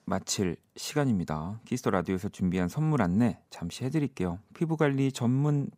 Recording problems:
none

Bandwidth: 15.5 kHz